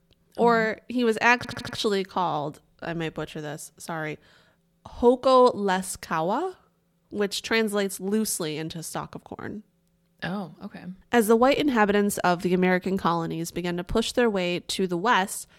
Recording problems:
audio stuttering; at 1.5 s

